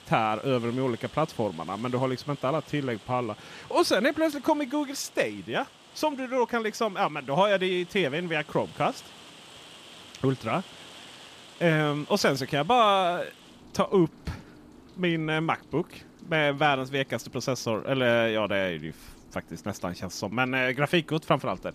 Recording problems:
rain or running water; faint; throughout; 20 dB below the speech

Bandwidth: 14.5 kHz